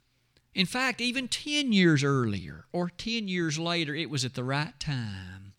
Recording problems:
none

